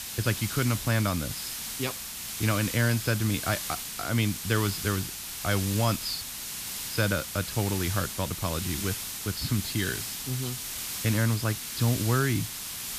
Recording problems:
high frequencies cut off; noticeable; nothing above 5 kHz
hiss; loud; throughout; 4 dB below the speech

